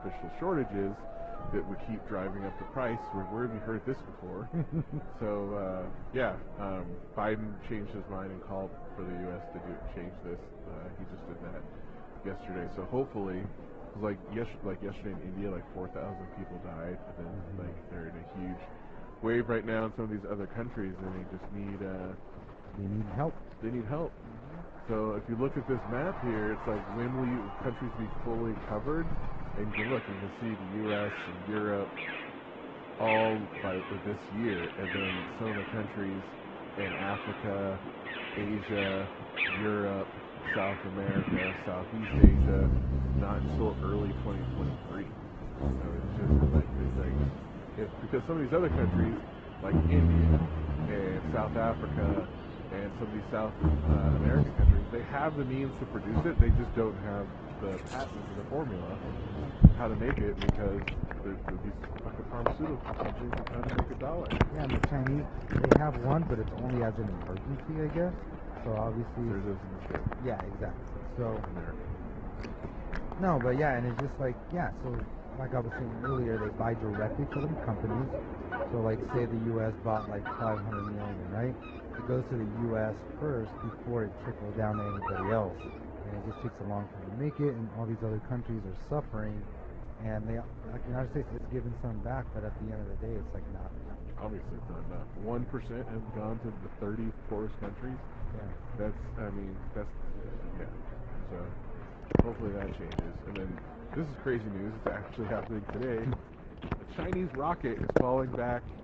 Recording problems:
muffled; very; fading above 3 kHz
garbled, watery; slightly
high frequencies cut off; slight; nothing above 8 kHz
animal sounds; very loud; throughout; 2 dB above the speech
murmuring crowd; noticeable; throughout; 10 dB below the speech

